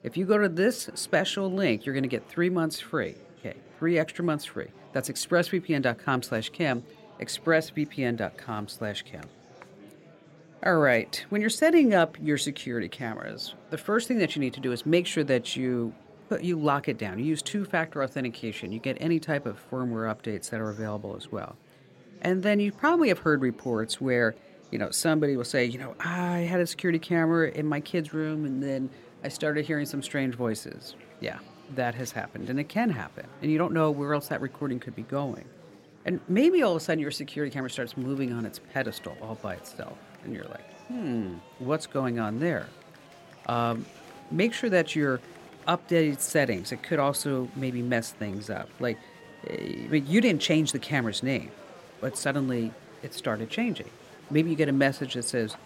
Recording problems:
murmuring crowd; faint; throughout; 25 dB below the speech

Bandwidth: 16 kHz